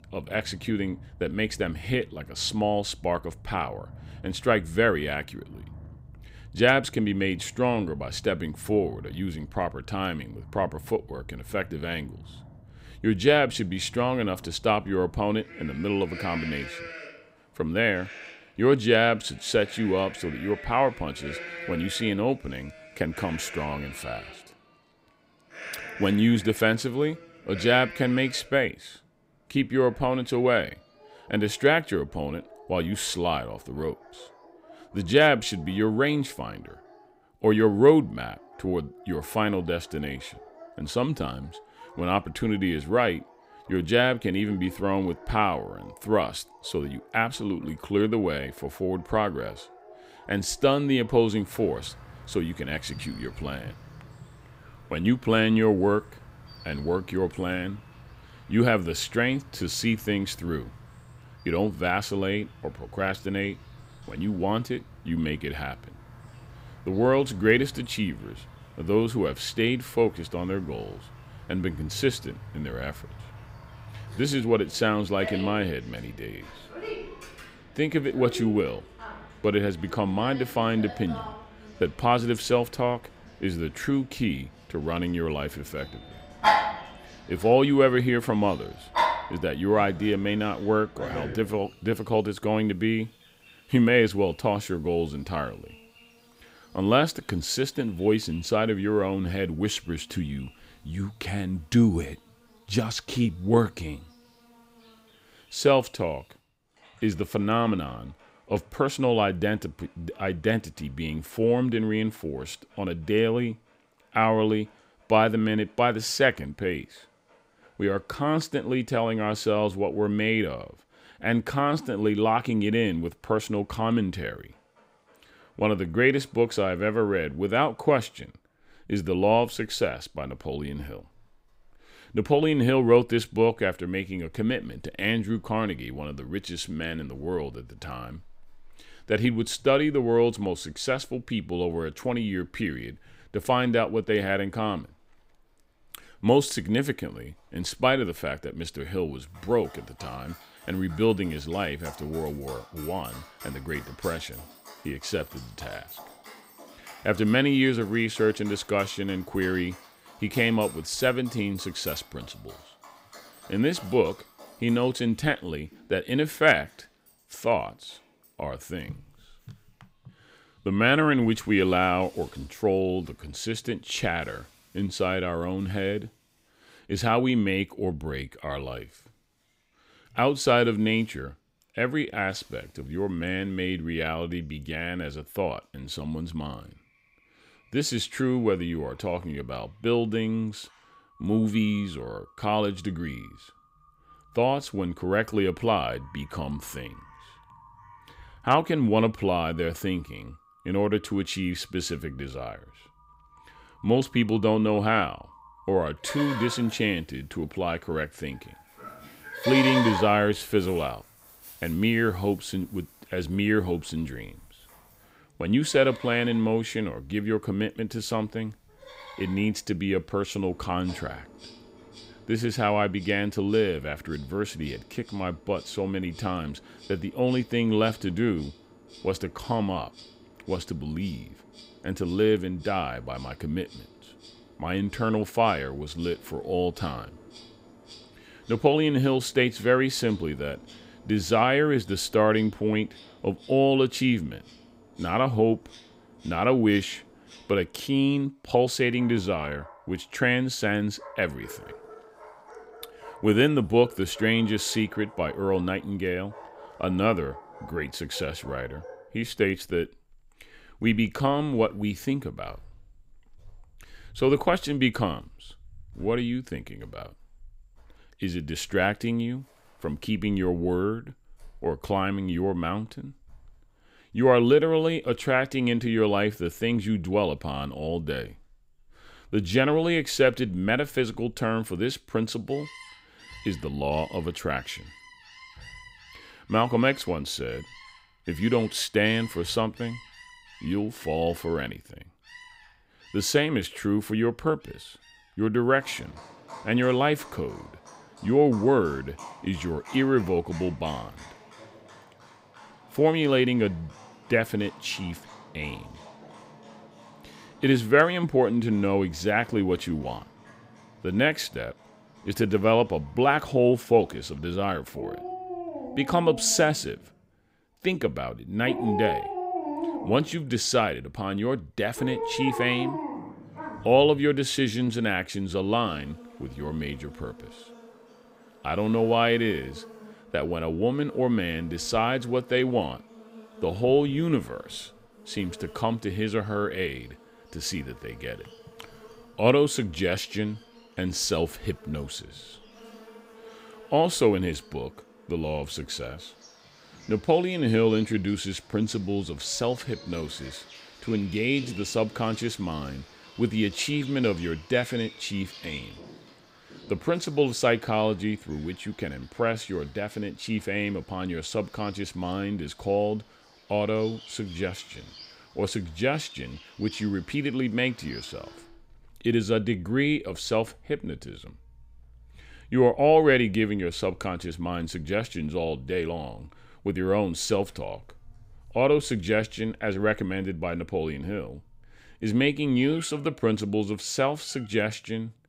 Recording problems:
animal sounds; noticeable; throughout; 15 dB below the speech

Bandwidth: 15.5 kHz